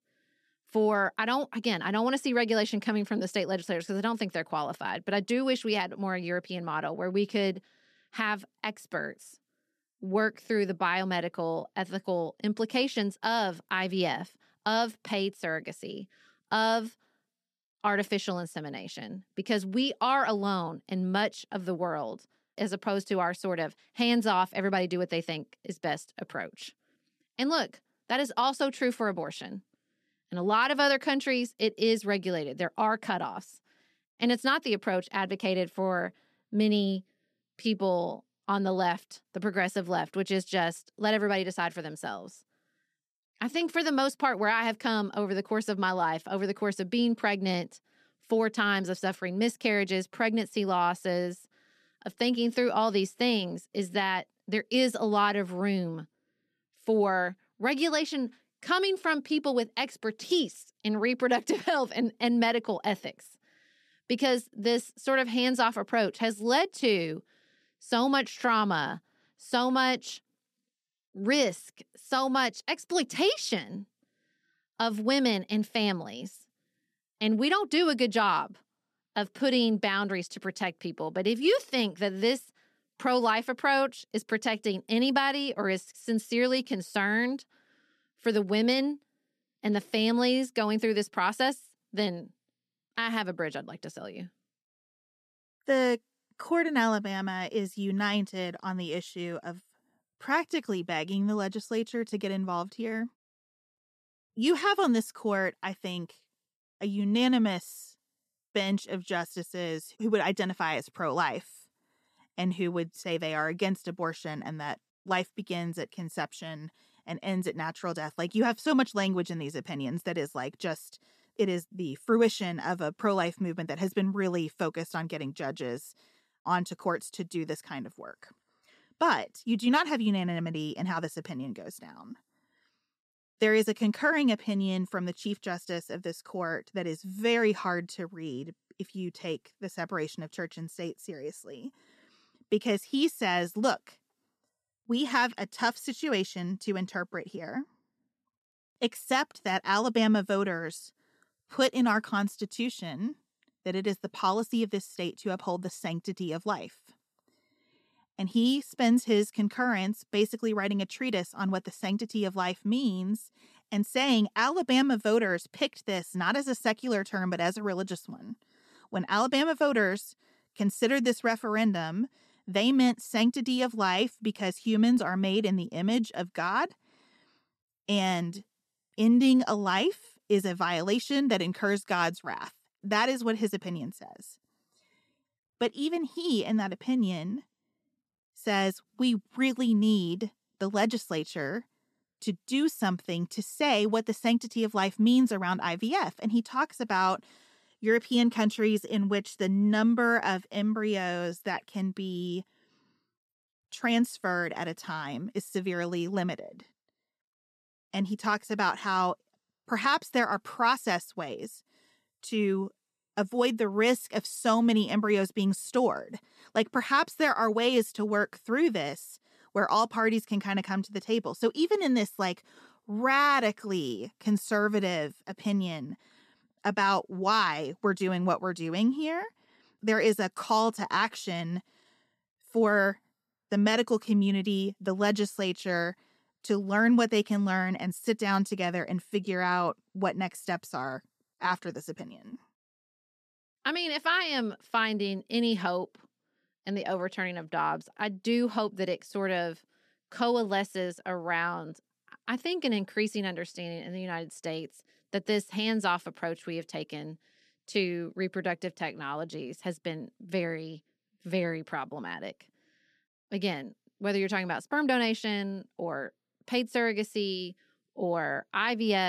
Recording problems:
abrupt cut into speech; at the end

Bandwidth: 14 kHz